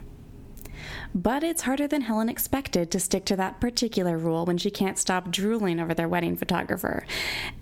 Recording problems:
squashed, flat; somewhat

